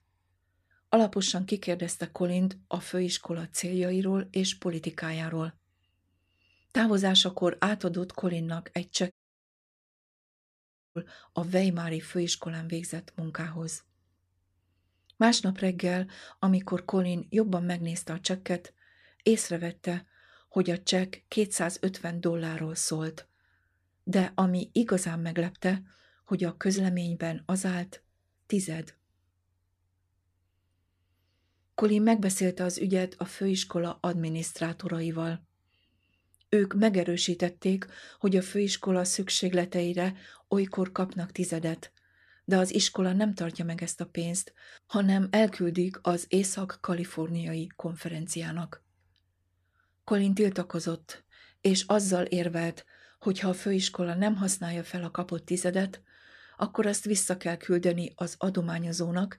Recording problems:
audio cutting out; at 9 s for 2 s

